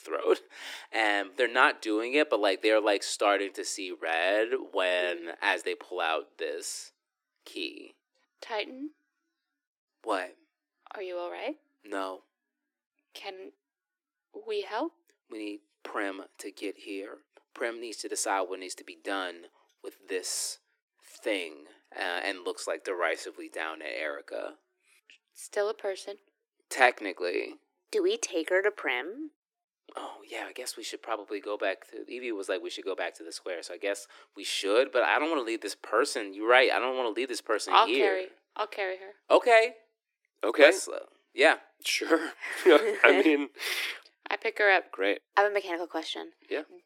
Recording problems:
thin; very; fading below 300 Hz

